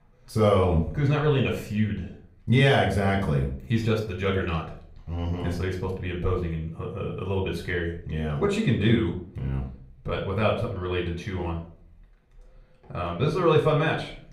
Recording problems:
off-mic speech; far
room echo; slight; dies away in 0.4 s

